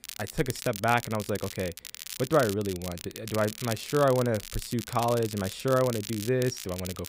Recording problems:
crackle, like an old record; noticeable; 10 dB below the speech

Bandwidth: 15.5 kHz